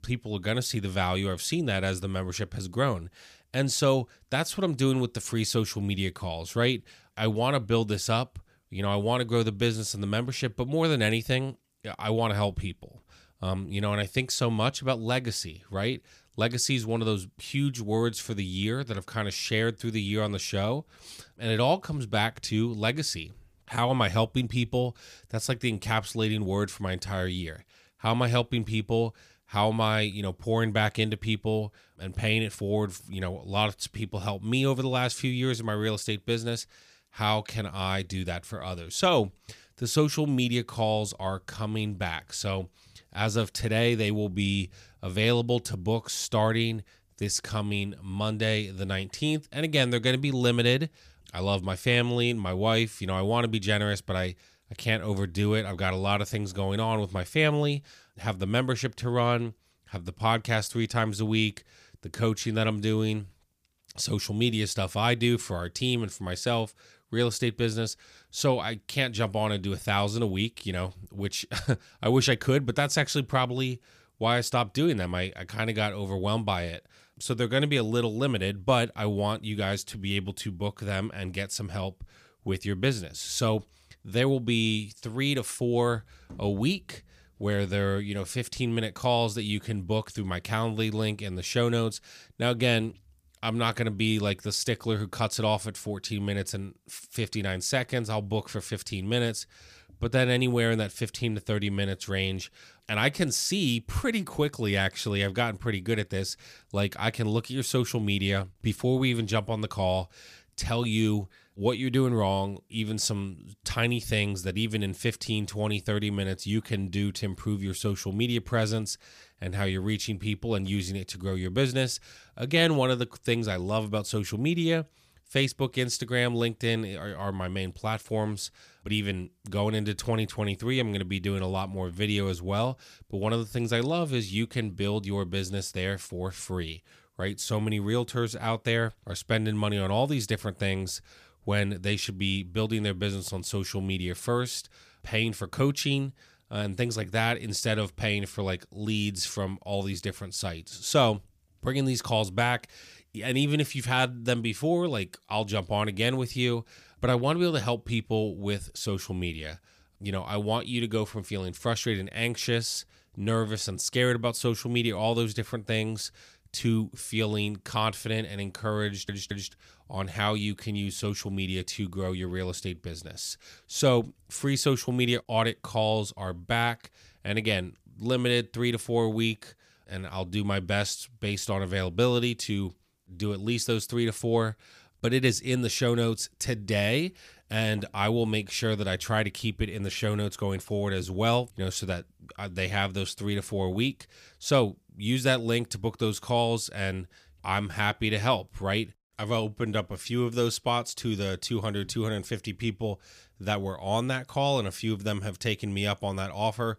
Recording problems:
audio stuttering; at 2:49

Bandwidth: 15 kHz